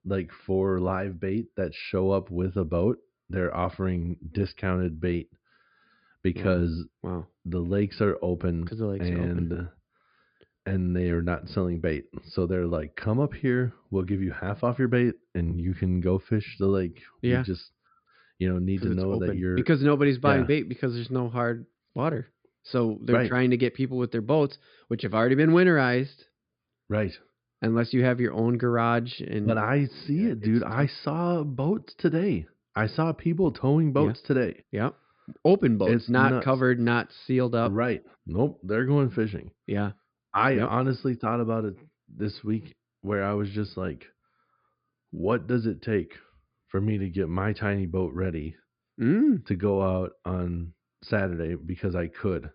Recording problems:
high frequencies cut off; severe; nothing above 5 kHz

